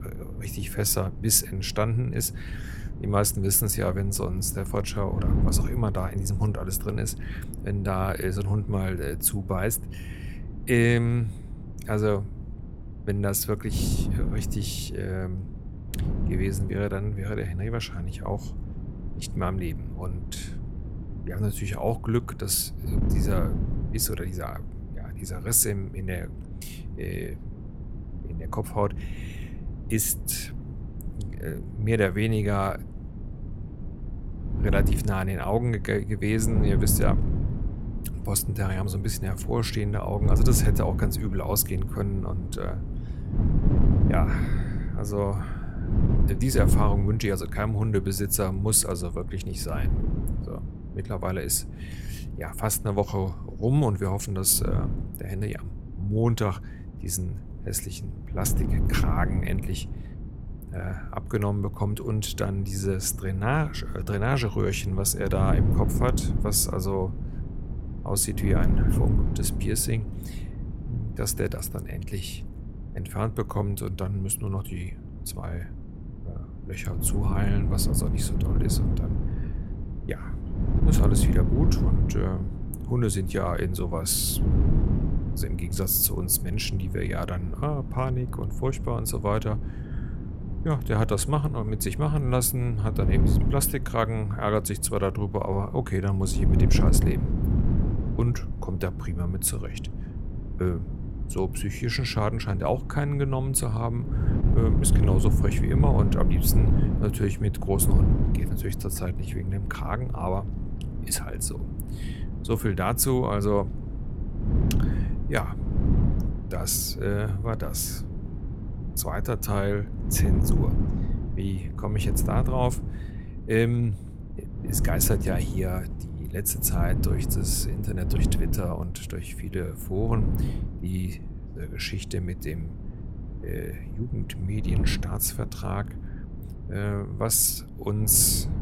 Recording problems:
wind noise on the microphone; heavy; 10 dB below the speech

